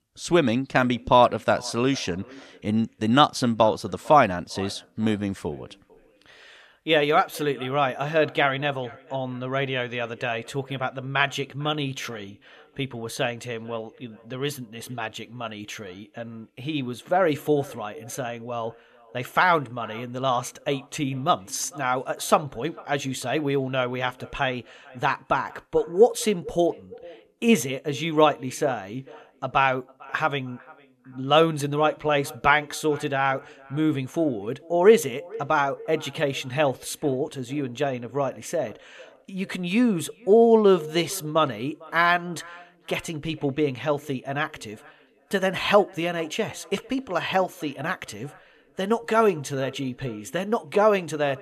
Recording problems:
echo of what is said; faint; throughout; 450 ms later, 25 dB below the speech

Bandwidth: 13.5 kHz